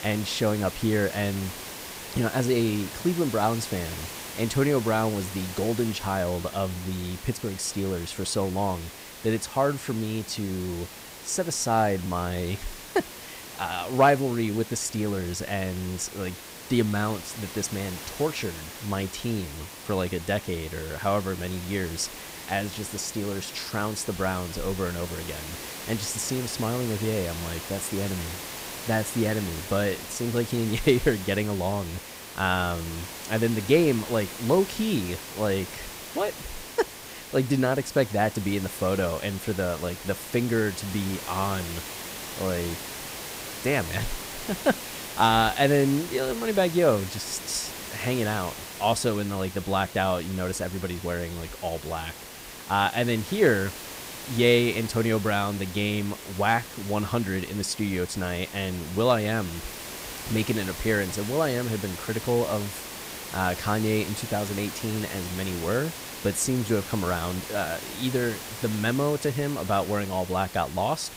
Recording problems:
hiss; loud; throughout; 10 dB below the speech

